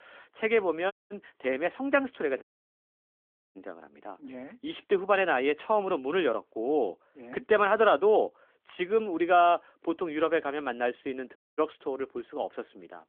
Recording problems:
phone-call audio; nothing above 3.5 kHz
audio cutting out; at 1 s, at 2.5 s for 1 s and at 11 s

